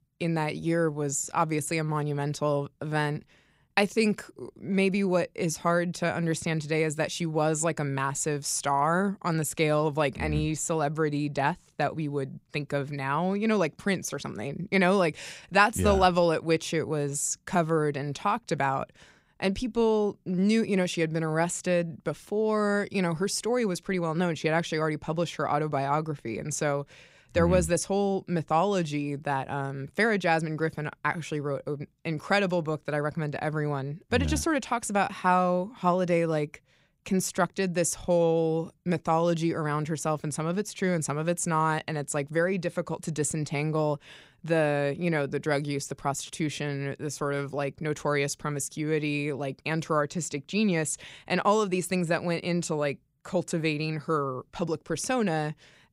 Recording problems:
none

